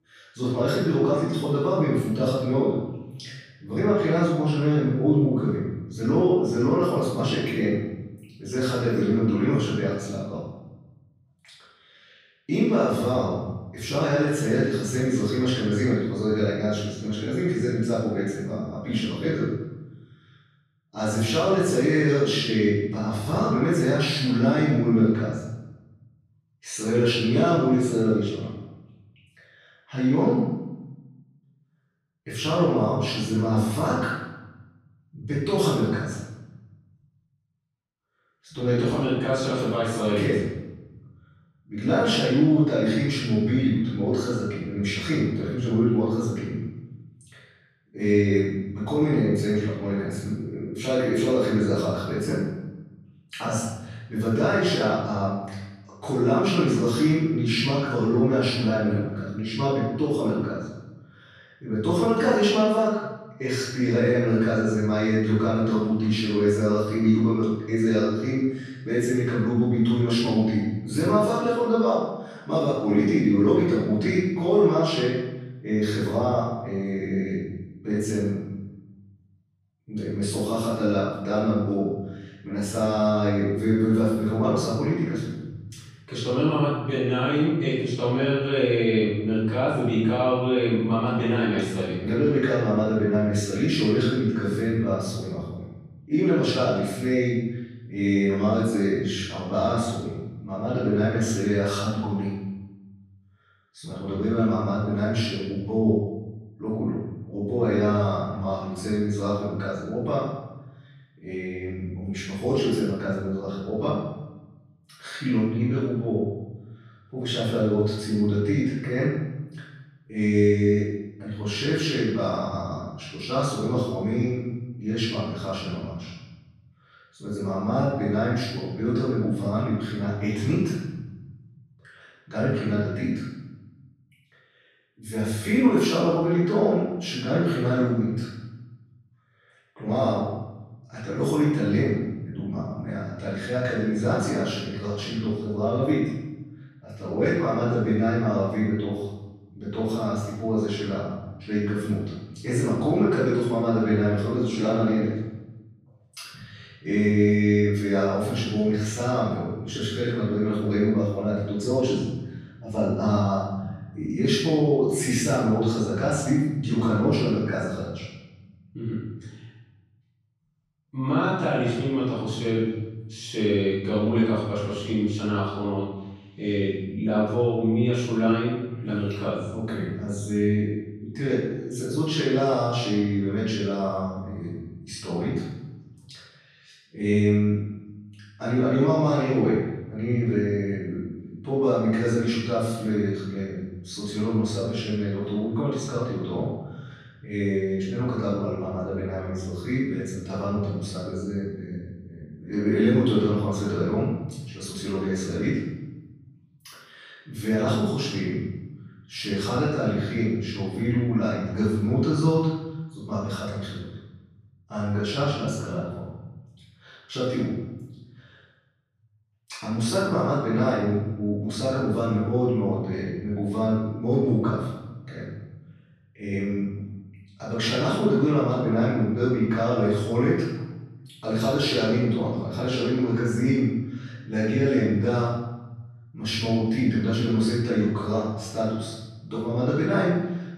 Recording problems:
room echo; strong; dies away in 1 s
off-mic speech; far

